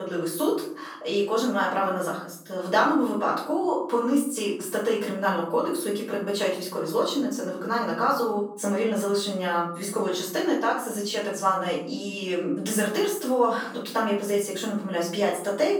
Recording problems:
off-mic speech; far
room echo; noticeable; dies away in 0.7 s
thin; very slightly; fading below 350 Hz
abrupt cut into speech; at the start

